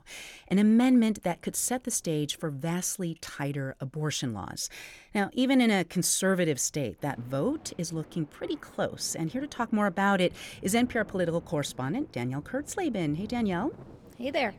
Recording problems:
rain or running water; faint; throughout; 20 dB below the speech

